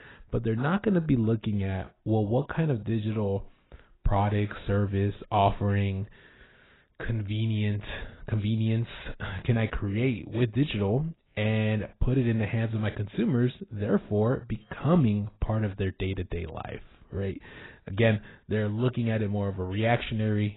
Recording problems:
garbled, watery; badly; nothing above 4 kHz

